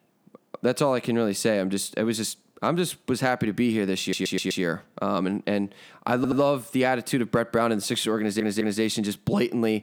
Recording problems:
audio stuttering; at 4 s, at 6 s and at 8 s

